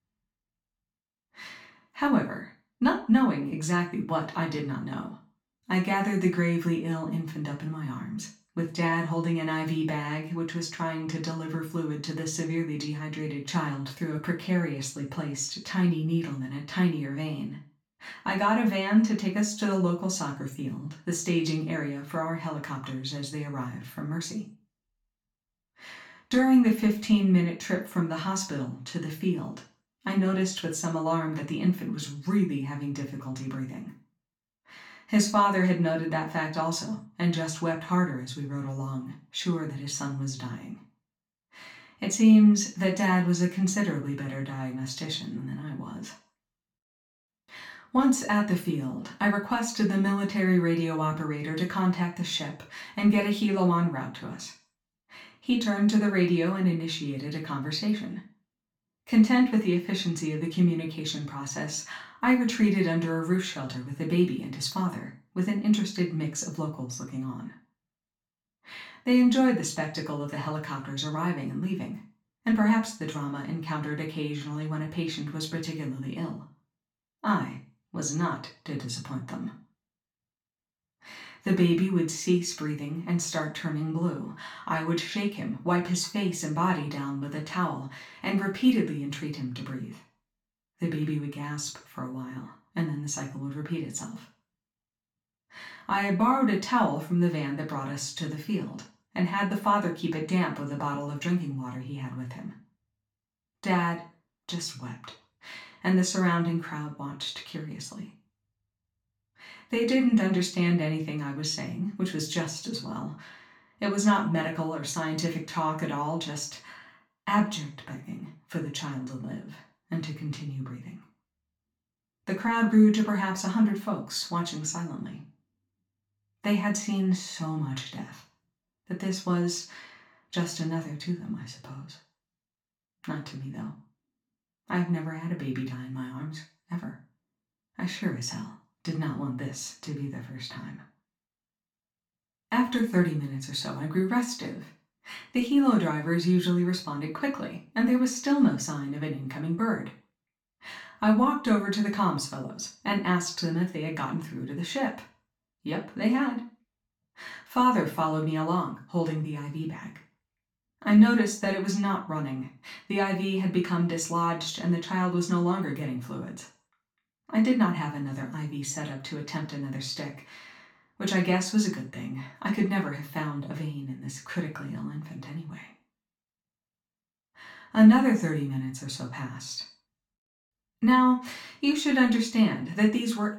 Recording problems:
off-mic speech; far
room echo; slight; dies away in 0.3 s

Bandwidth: 18 kHz